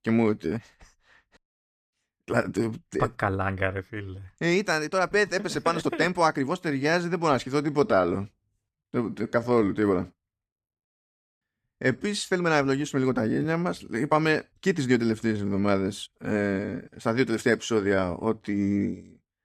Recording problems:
uneven, jittery; strongly; from 2 to 19 s

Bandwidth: 14.5 kHz